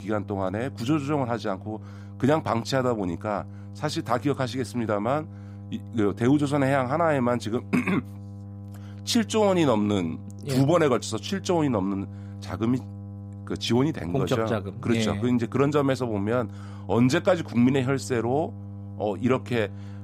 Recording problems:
electrical hum; faint; throughout; 50 Hz, 25 dB below the speech

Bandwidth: 15.5 kHz